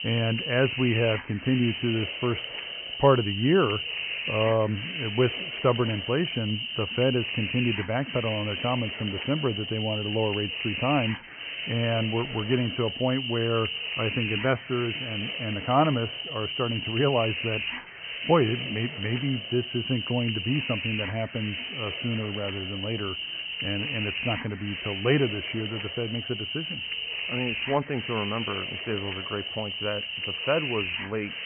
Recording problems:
high frequencies cut off; severe; nothing above 3 kHz
hiss; loud; throughout; 3 dB below the speech

